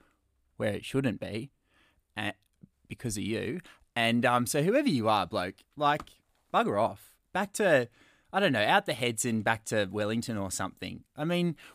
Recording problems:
none

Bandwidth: 15 kHz